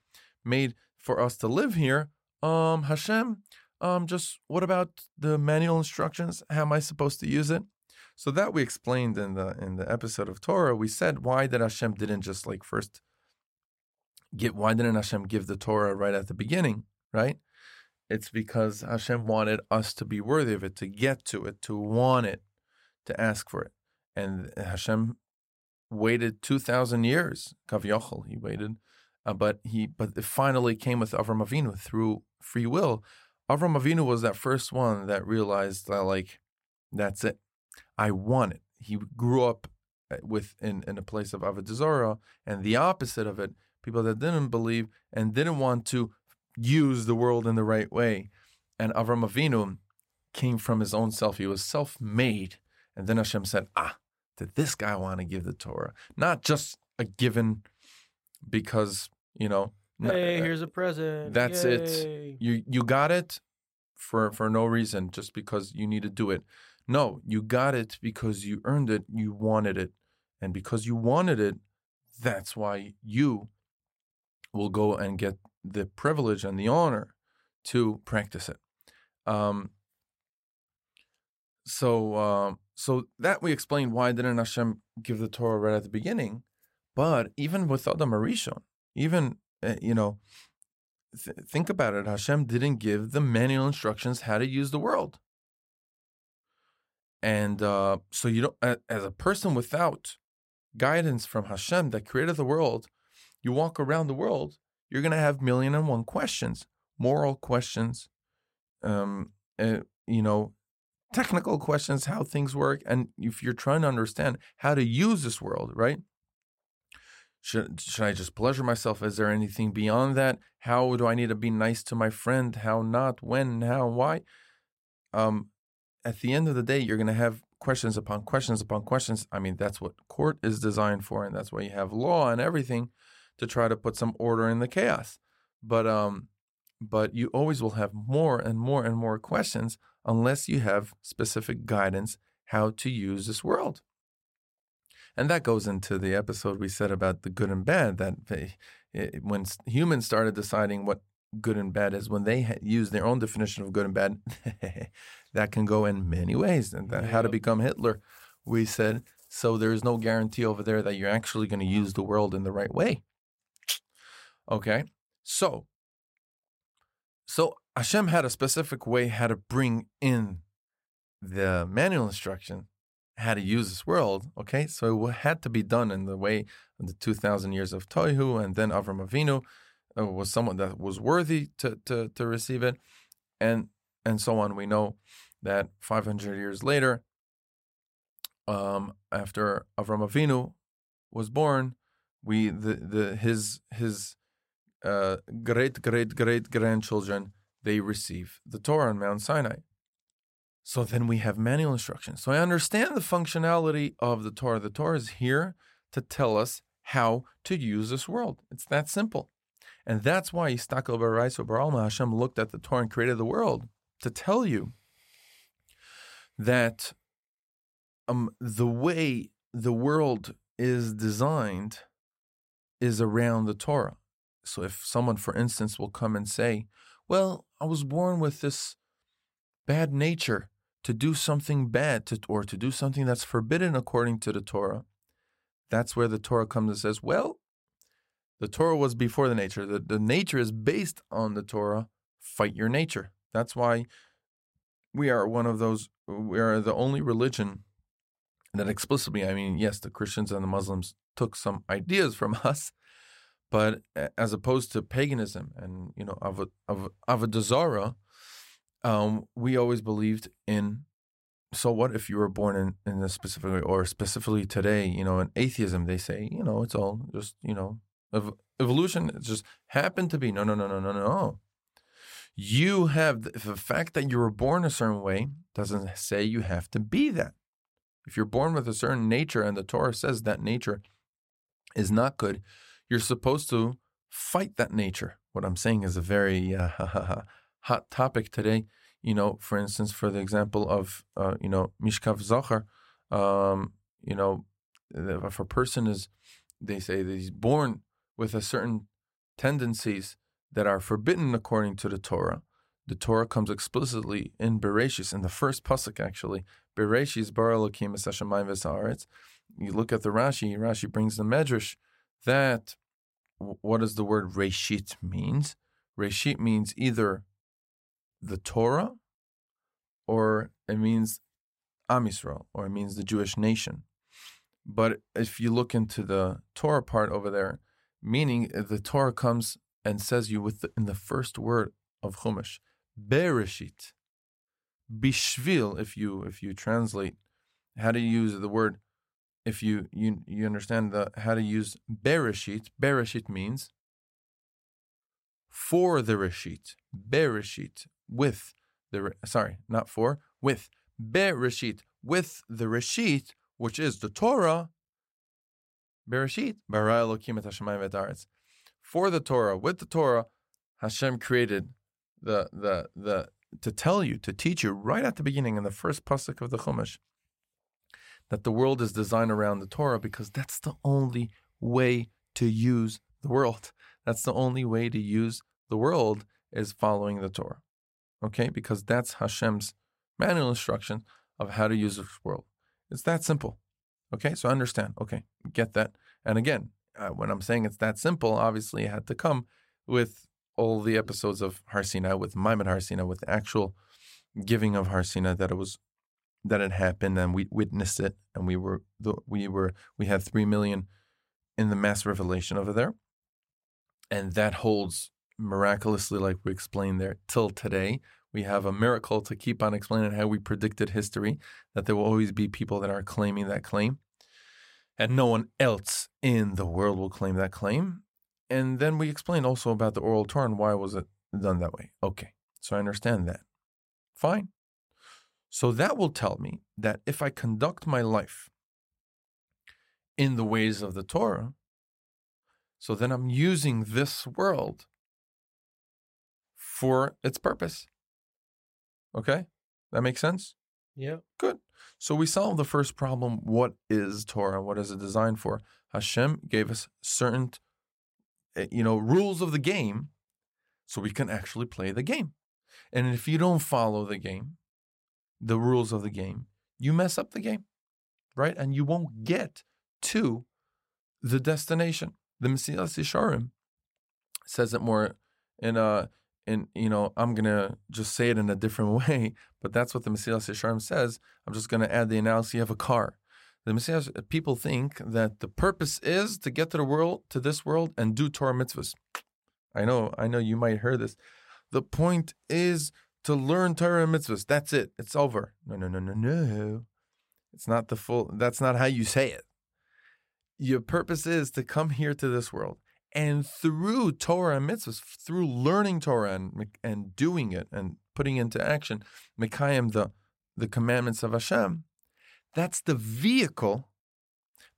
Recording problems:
none

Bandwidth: 16 kHz